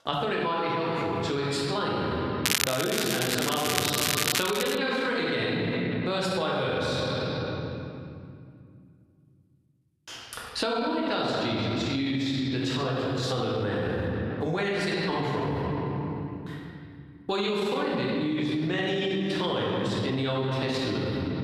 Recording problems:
room echo; strong; dies away in 2.2 s
off-mic speech; far
squashed, flat; somewhat
crackling; very loud; from 2.5 to 5 s; 1 dB above the speech

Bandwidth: 14.5 kHz